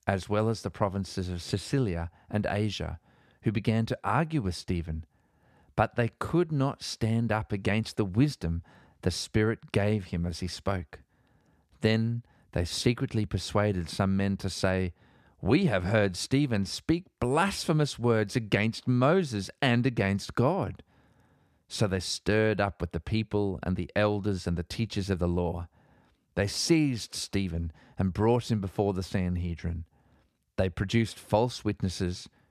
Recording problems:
none

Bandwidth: 14.5 kHz